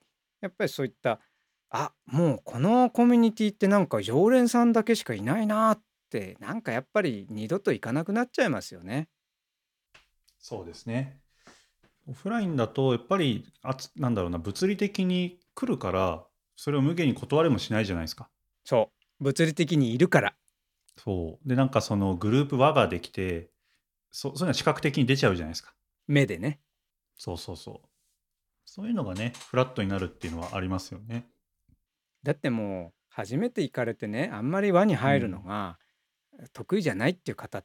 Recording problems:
none

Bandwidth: 18 kHz